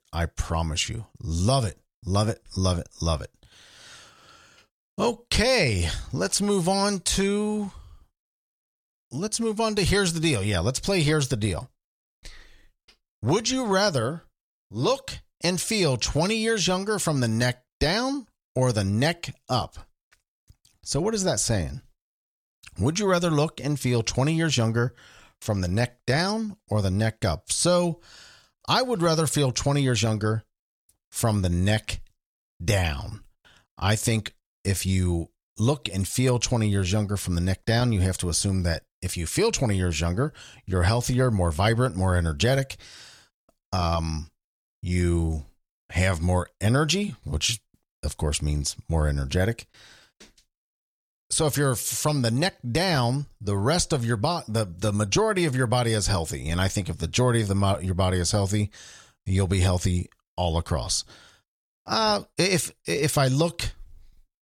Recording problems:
none

